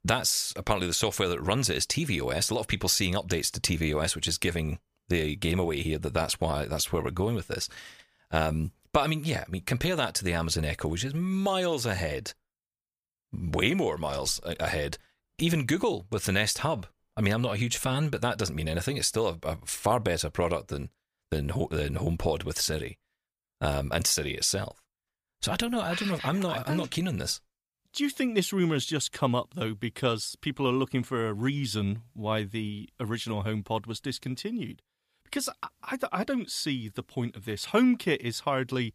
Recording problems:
none

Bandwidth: 15 kHz